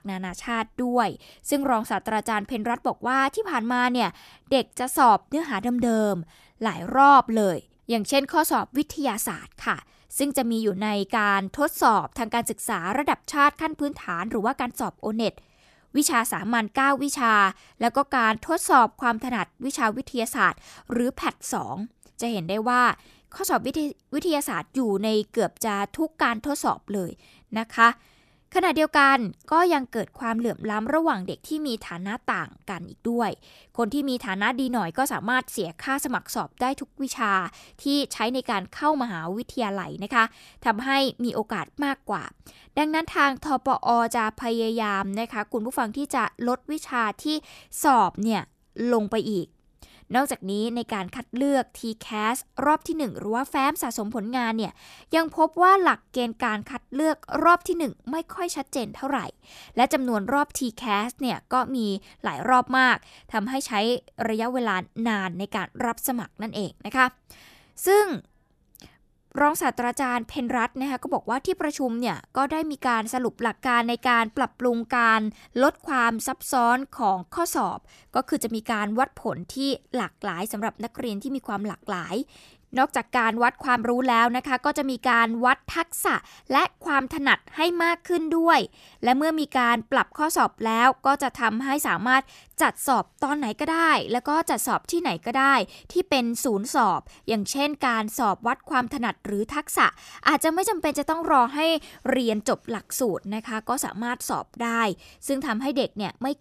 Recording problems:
none

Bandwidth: 14 kHz